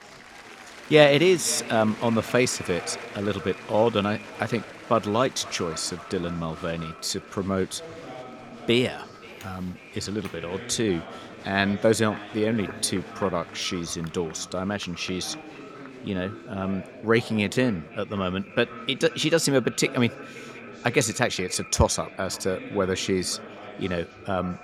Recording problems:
echo of what is said; faint; throughout; 530 ms later, 20 dB below the speech
chatter from many people; noticeable; throughout; 15 dB below the speech

